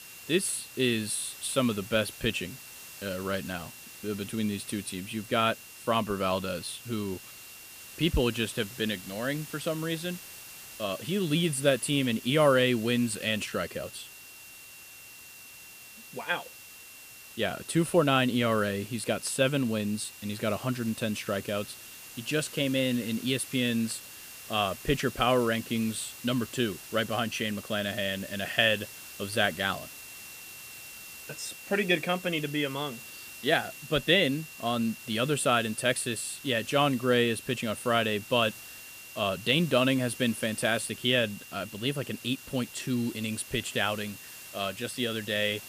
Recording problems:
hiss; noticeable; throughout; 15 dB below the speech
high-pitched whine; faint; throughout; 2.5 kHz, 20 dB below the speech

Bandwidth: 15 kHz